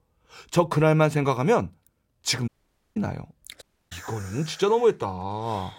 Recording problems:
audio cutting out; at 2.5 s and at 3.5 s

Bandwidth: 16 kHz